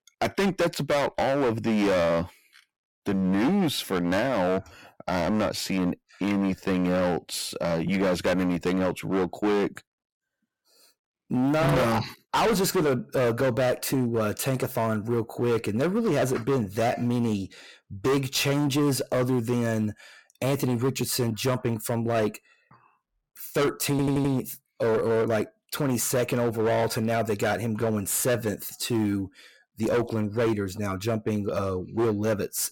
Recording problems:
distortion; heavy; 16% of the sound clipped
audio stuttering; at 24 s

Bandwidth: 17.5 kHz